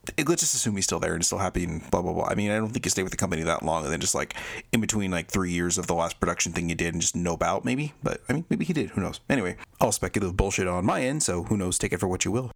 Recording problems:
squashed, flat; somewhat

